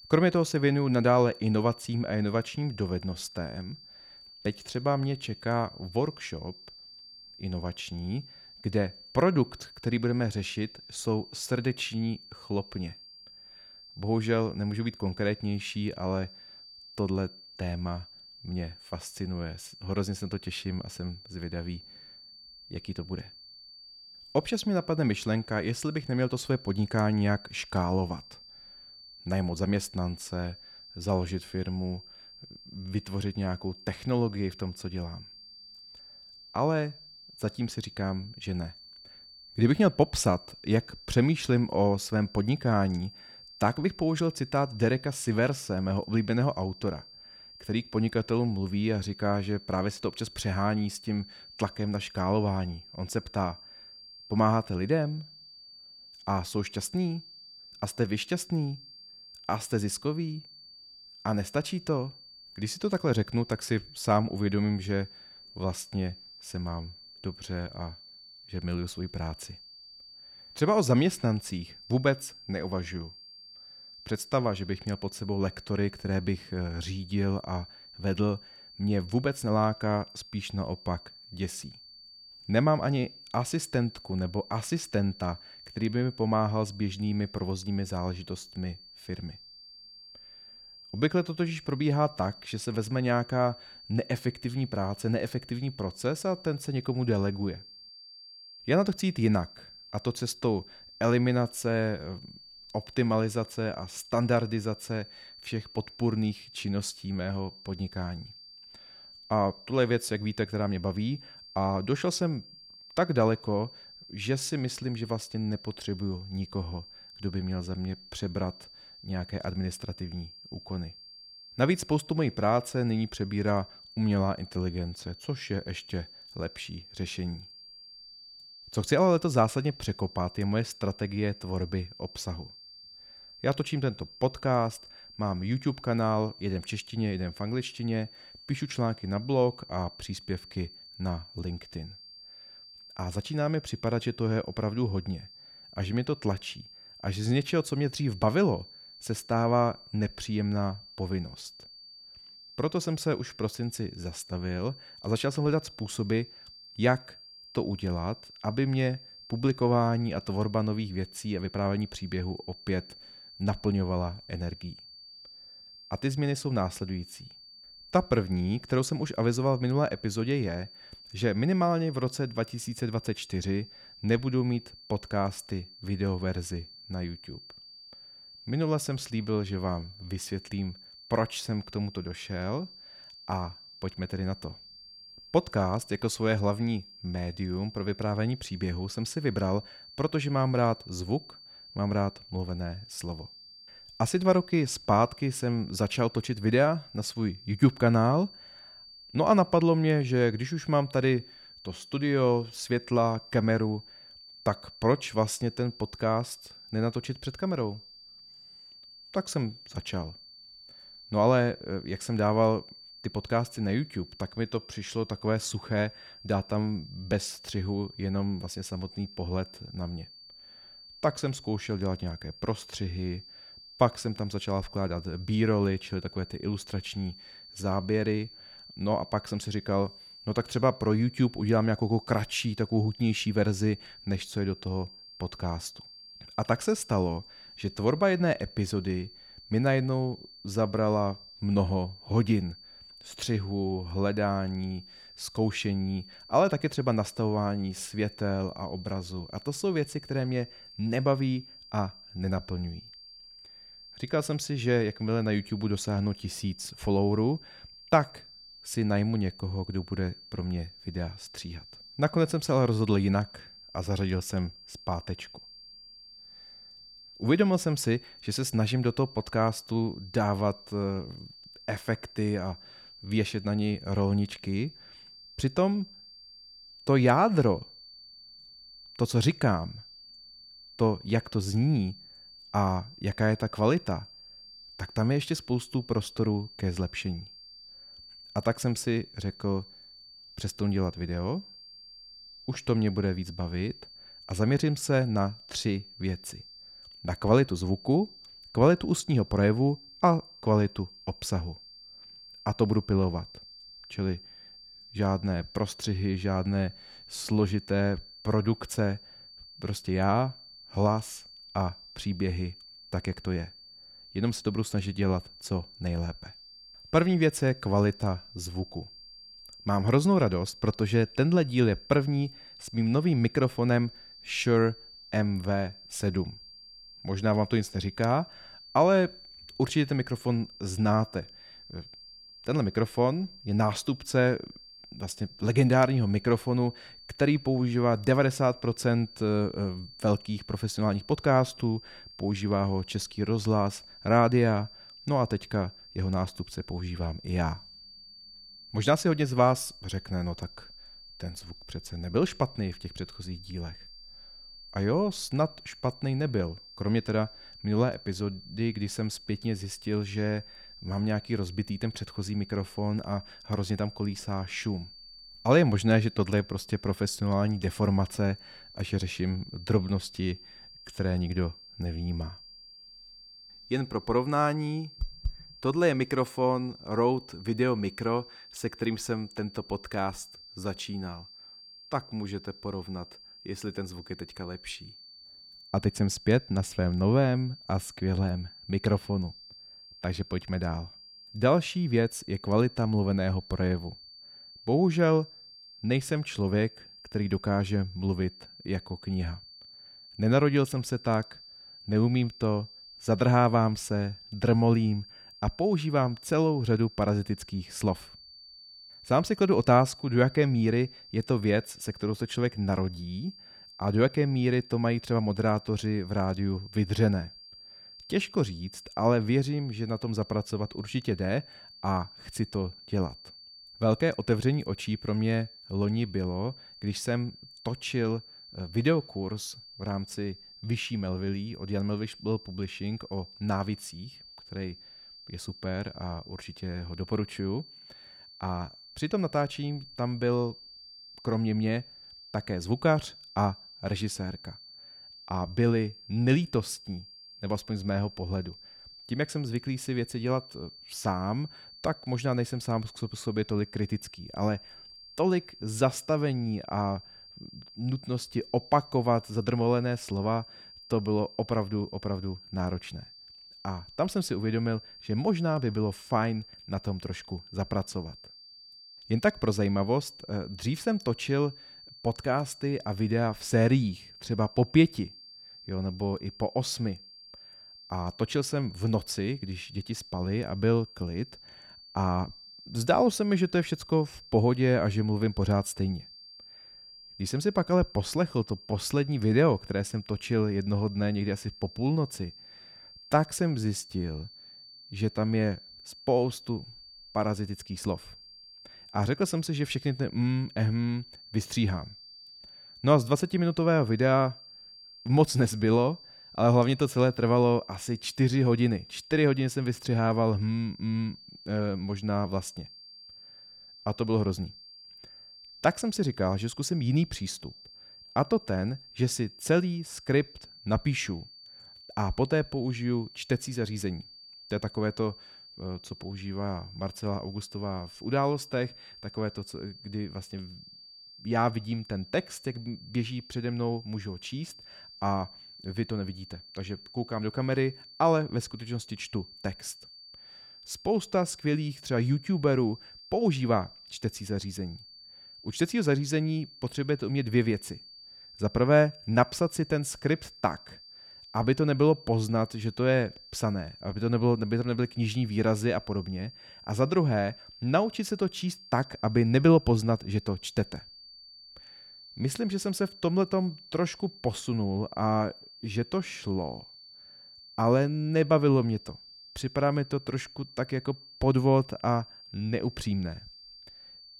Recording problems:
high-pitched whine; noticeable; throughout; 4.5 kHz, 20 dB below the speech

